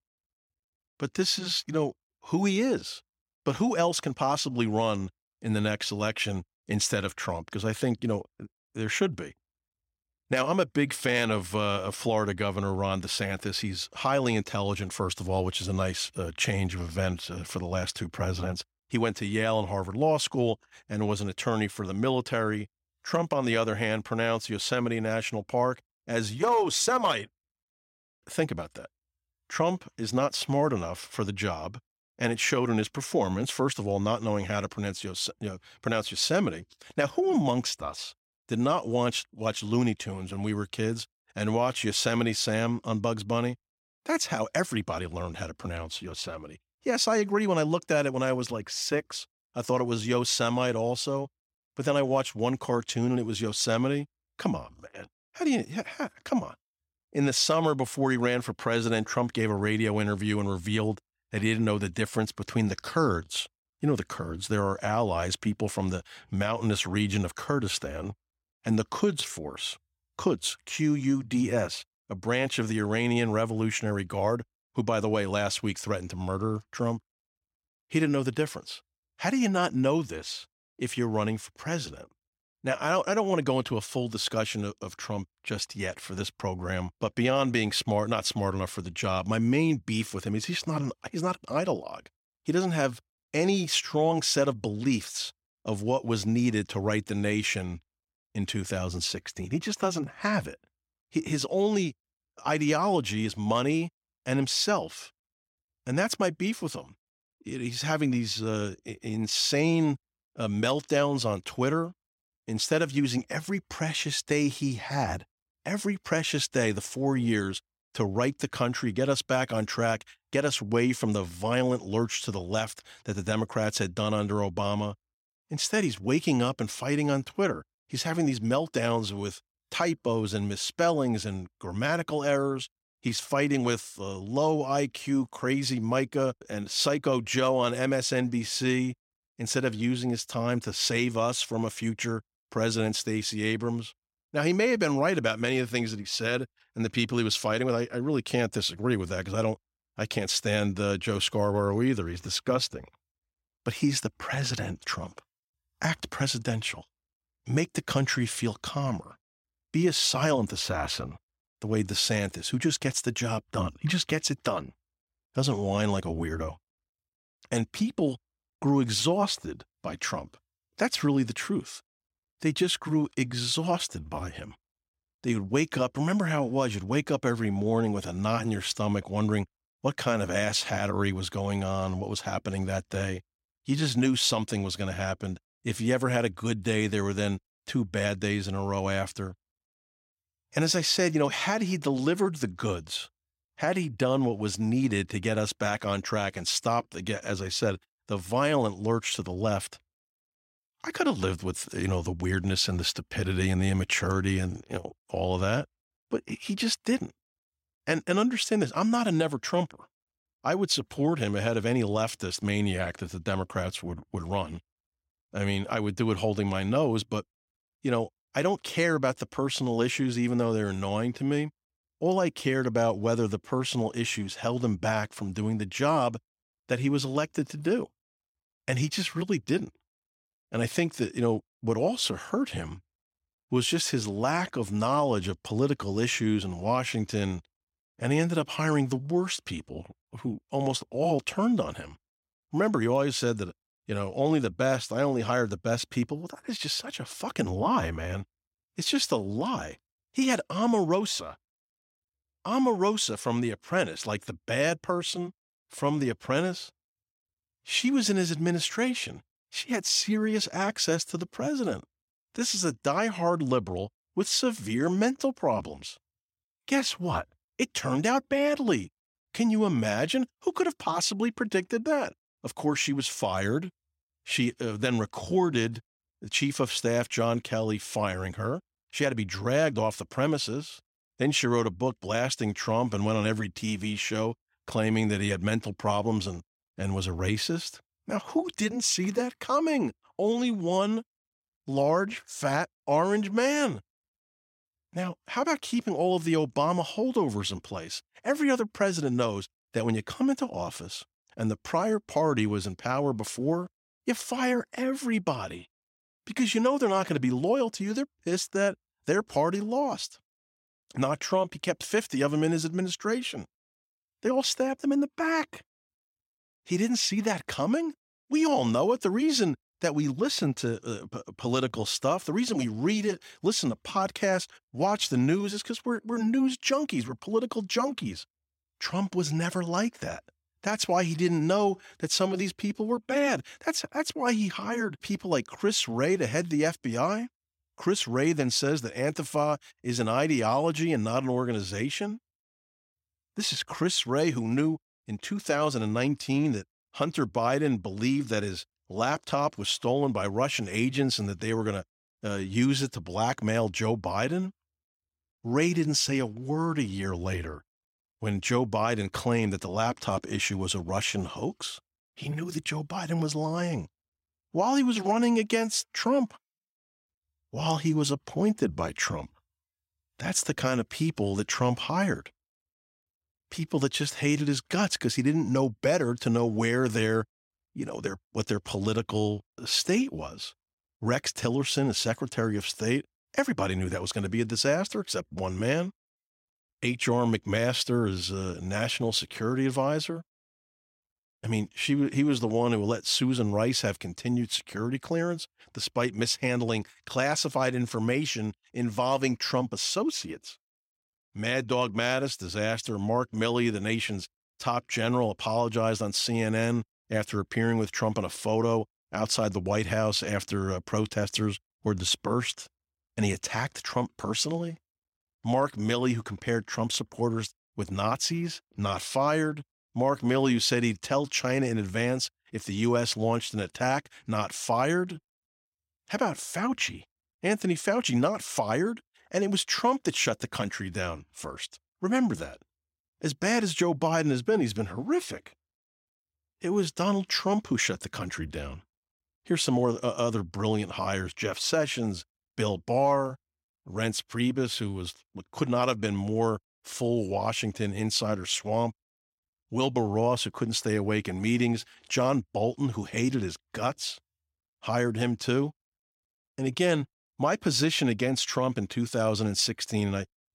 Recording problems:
none

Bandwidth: 16 kHz